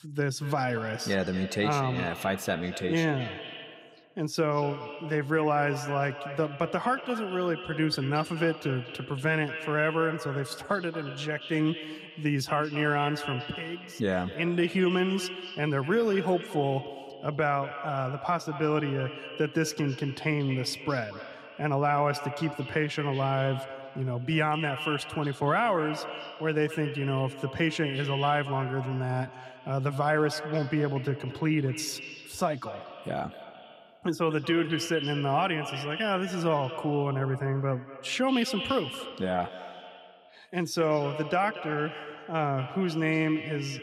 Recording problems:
echo of what is said; strong; throughout; 230 ms later, 10 dB below the speech

